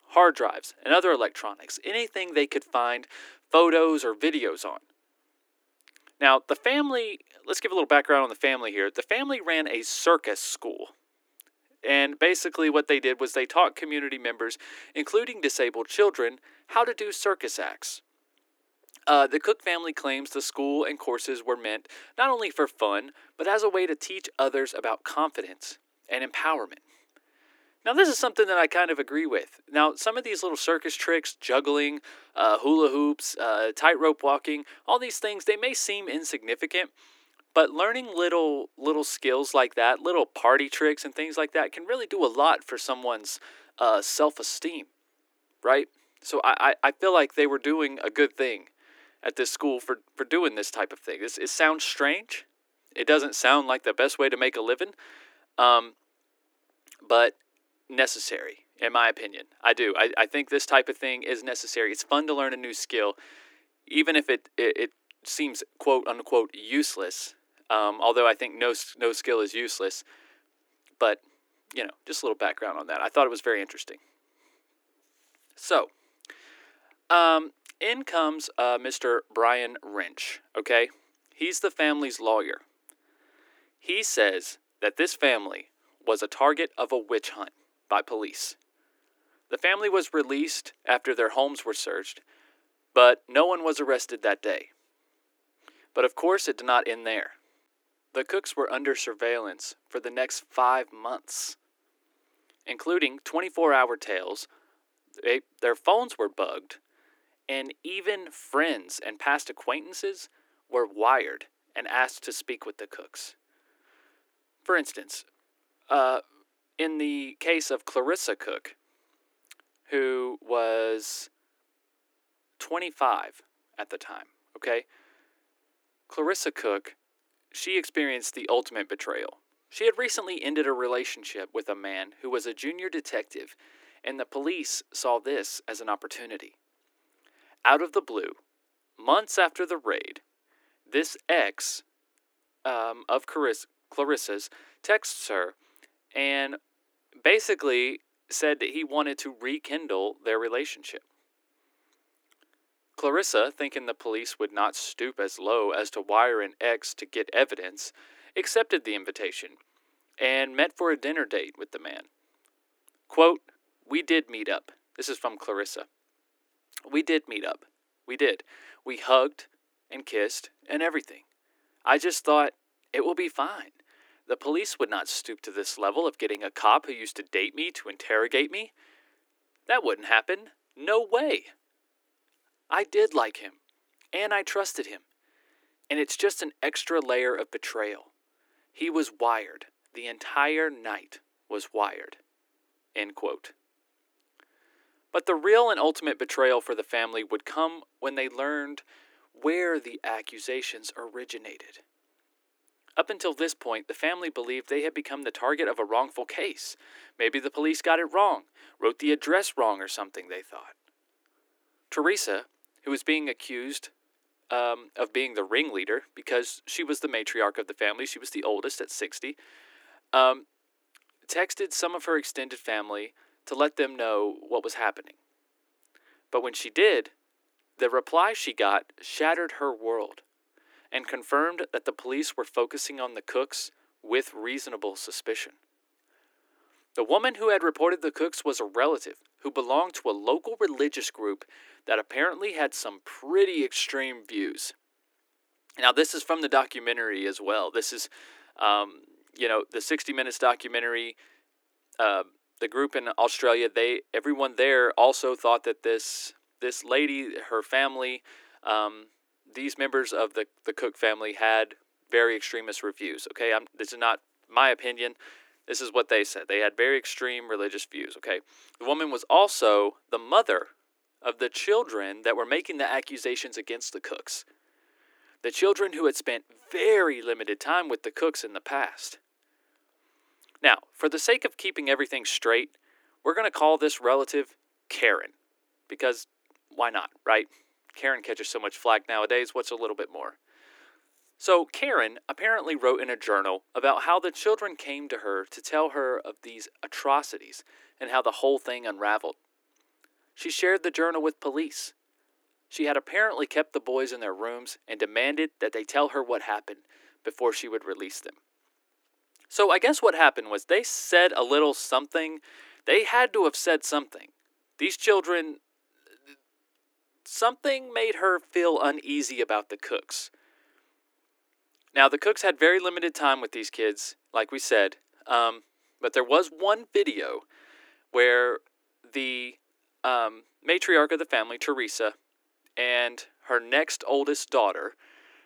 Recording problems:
thin; somewhat; fading below 300 Hz

